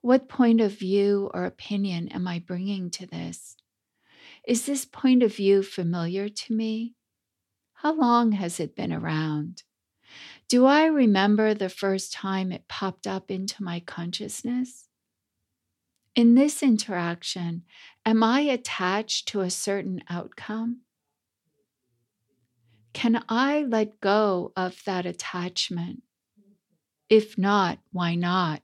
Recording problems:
none

